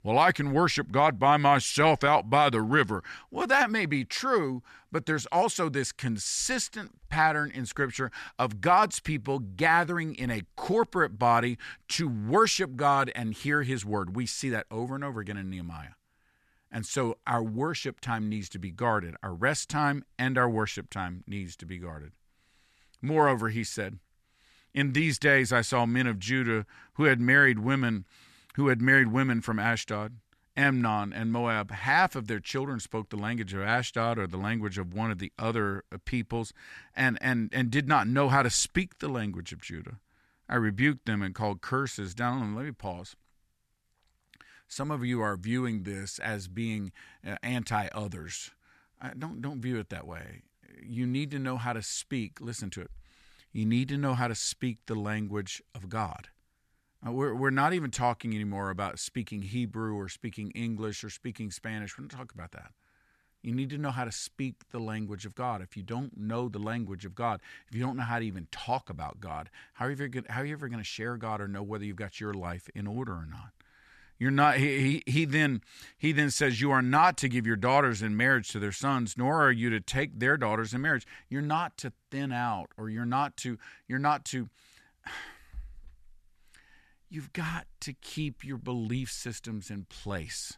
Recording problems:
none

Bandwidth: 13.5 kHz